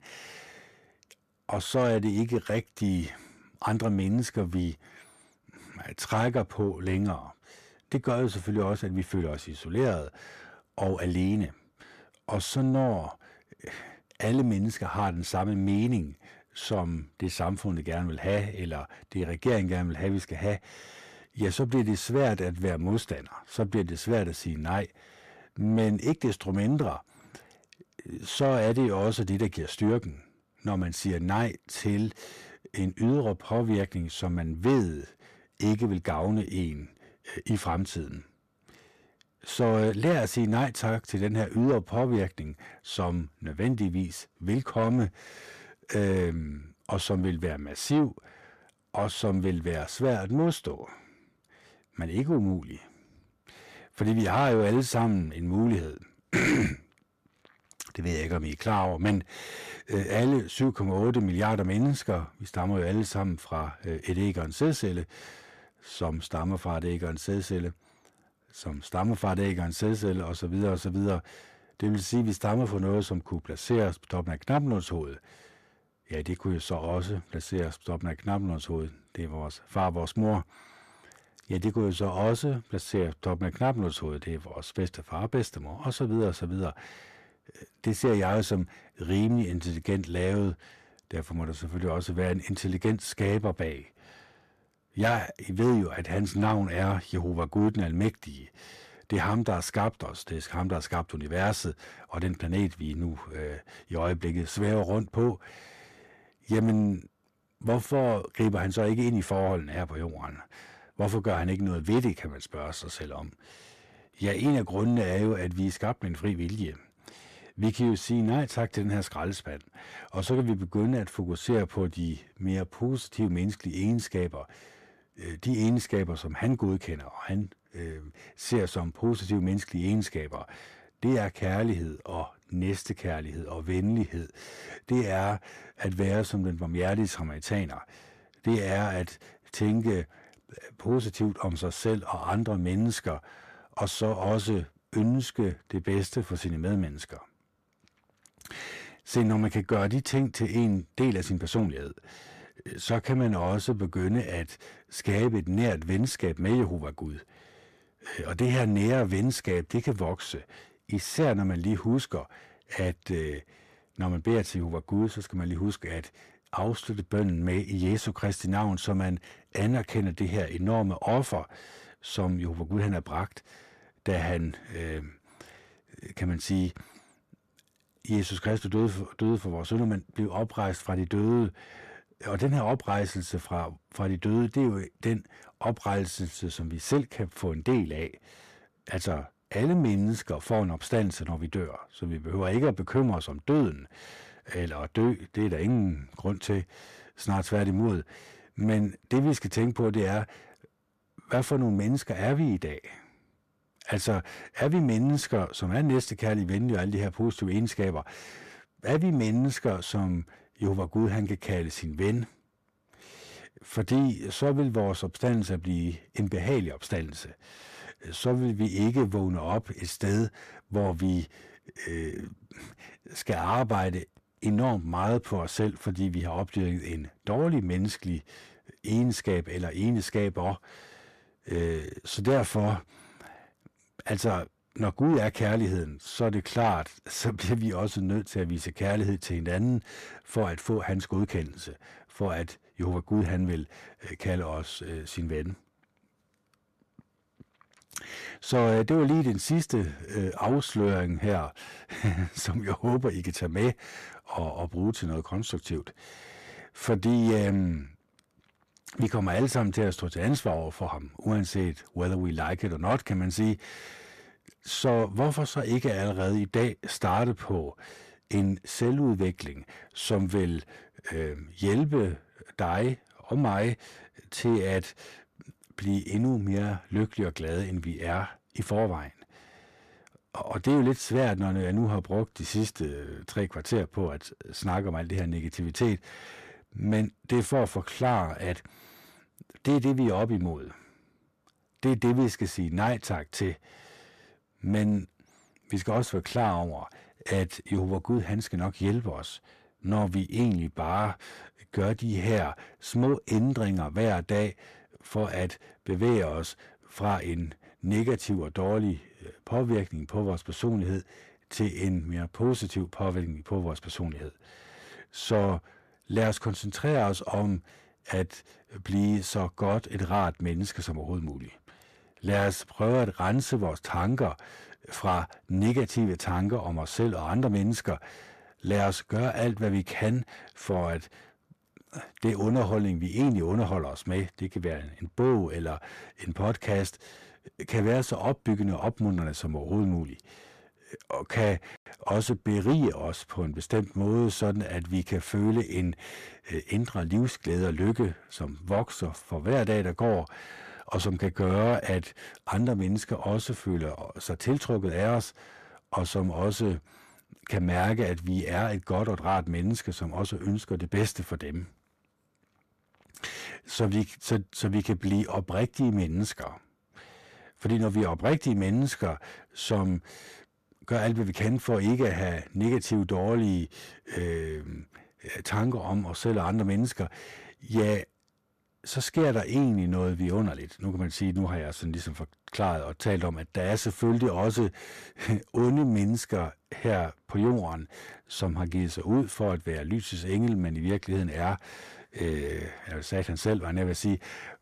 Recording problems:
distortion; slight; 10 dB below the speech

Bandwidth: 14.5 kHz